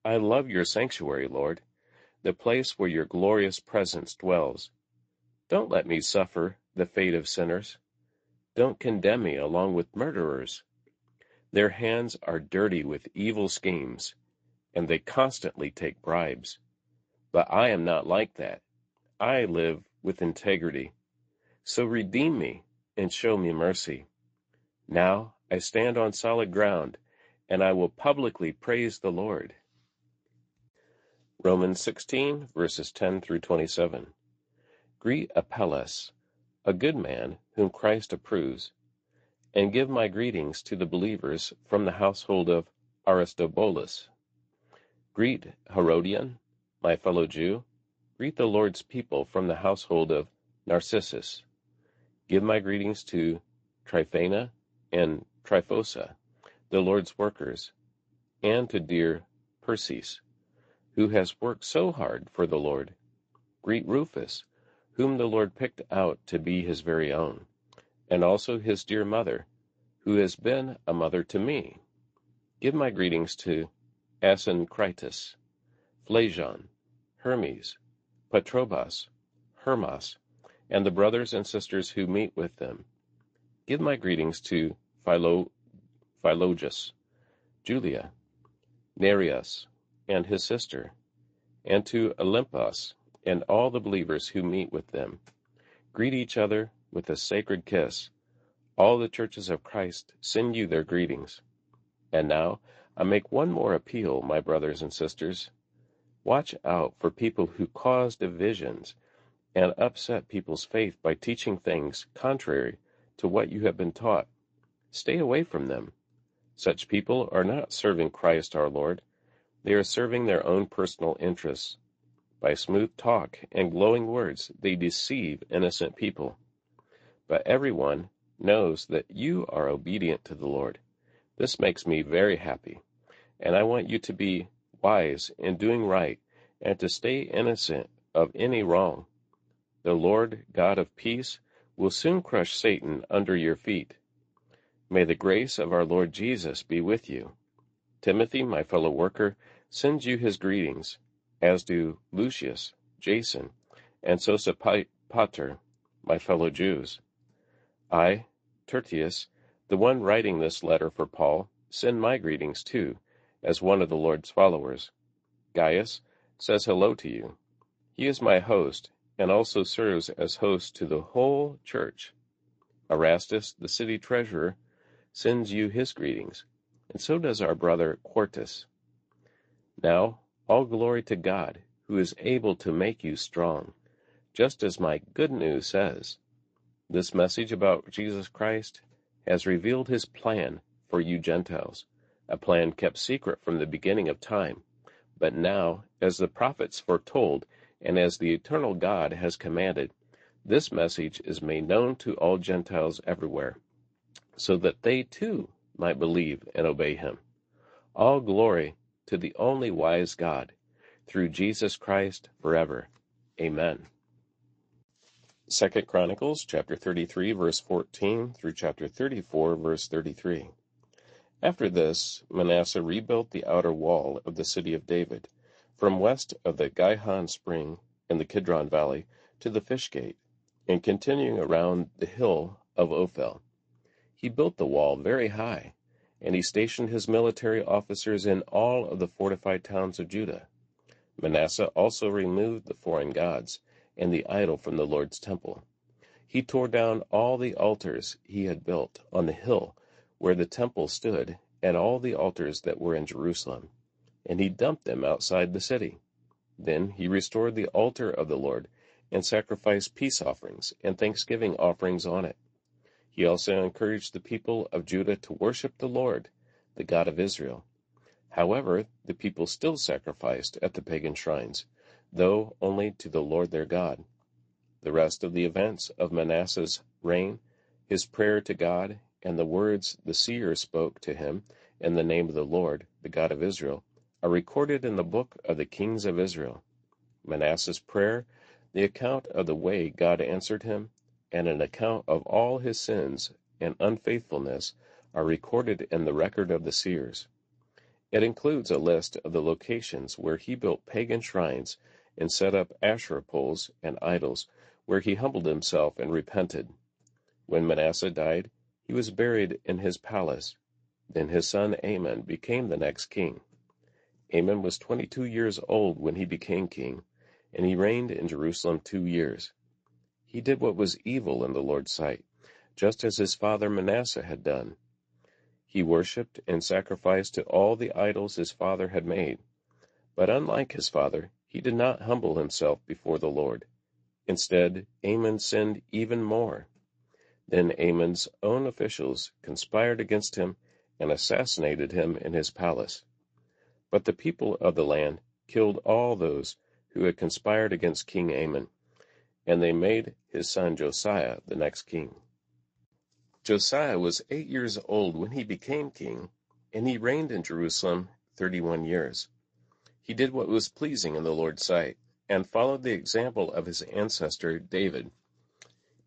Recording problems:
garbled, watery; slightly; nothing above 7.5 kHz

